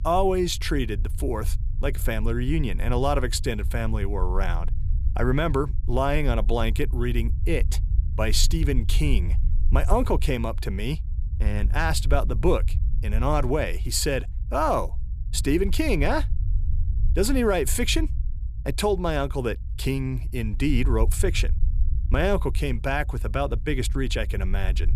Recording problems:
low rumble; faint; throughout; 20 dB below the speech

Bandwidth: 14.5 kHz